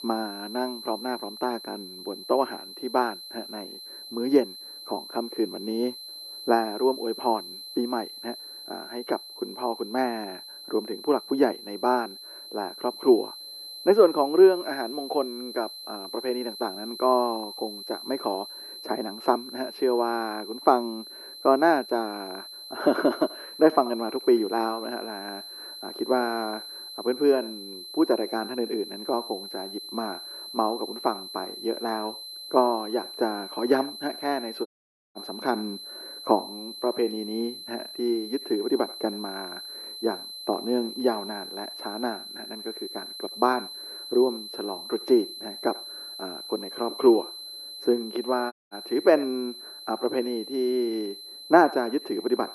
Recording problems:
muffled; very; fading above 3 kHz
thin; somewhat; fading below 300 Hz
echo of what is said; faint; from 23 s on; 80 ms later, 20 dB below the speech
high-pitched whine; noticeable; throughout; 4 kHz, 10 dB below the speech
audio cutting out; at 35 s and at 49 s

